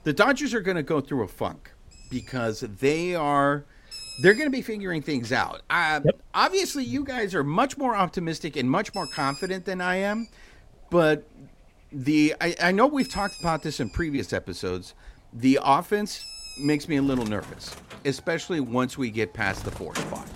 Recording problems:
animal sounds; noticeable; throughout; 15 dB below the speech

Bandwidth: 16 kHz